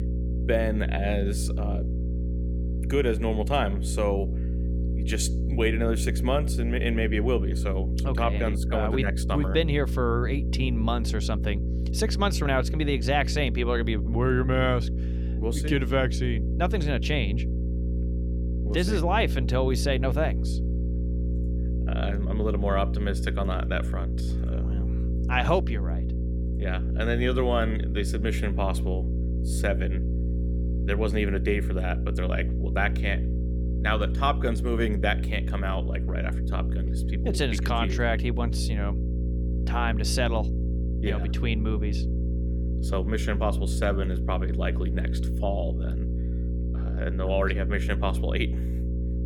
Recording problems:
electrical hum; noticeable; throughout; 60 Hz, 10 dB below the speech

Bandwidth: 17.5 kHz